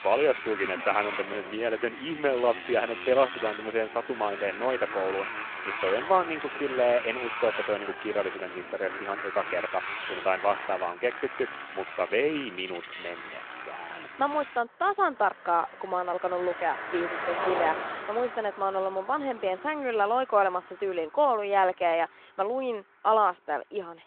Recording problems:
phone-call audio
traffic noise; loud; throughout; 7 dB below the speech

